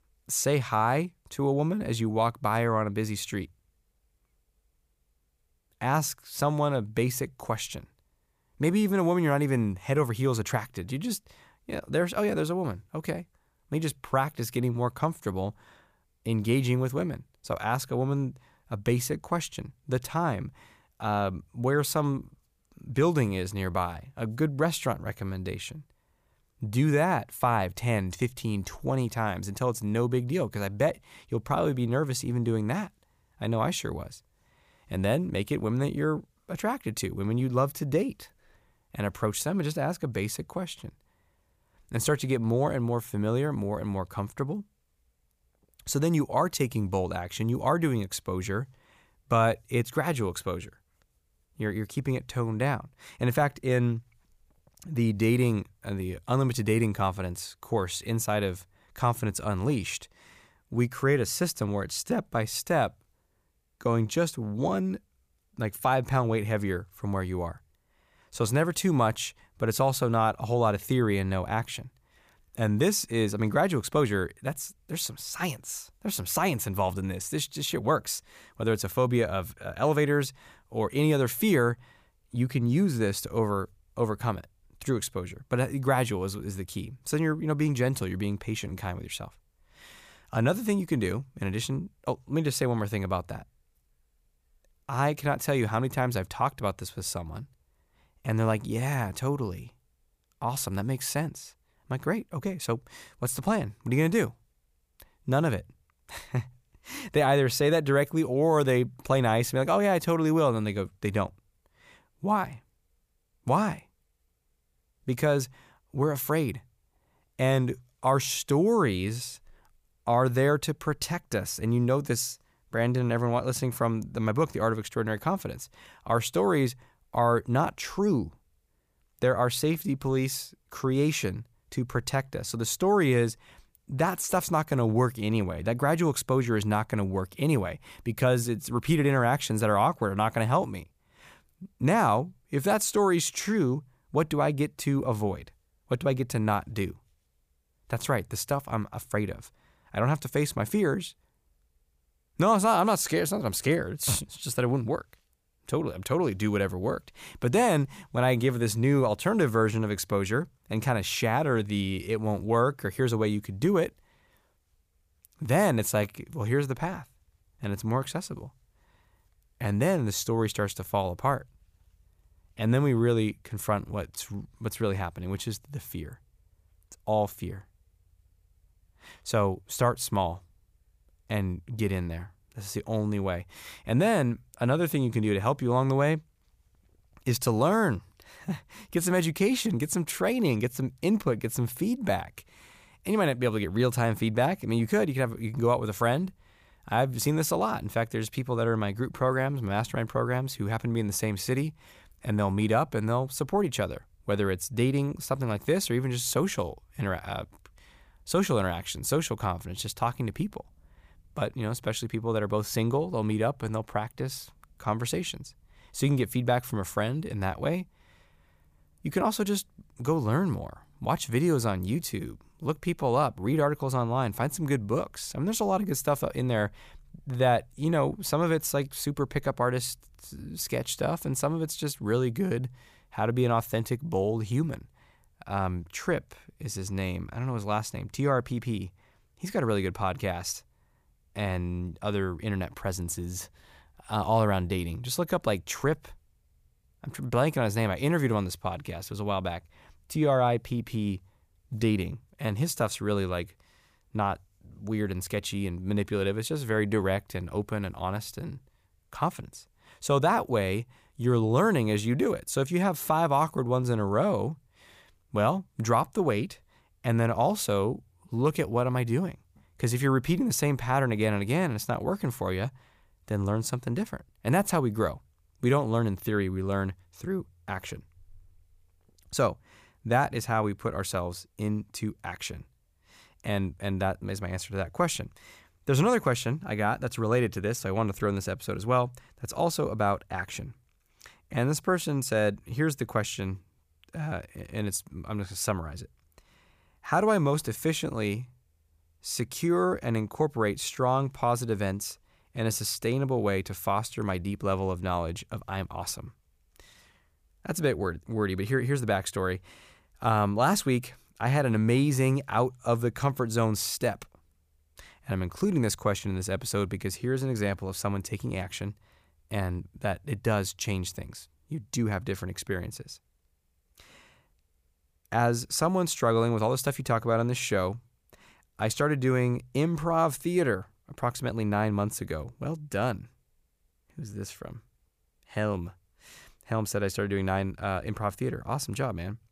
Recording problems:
none

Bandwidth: 15 kHz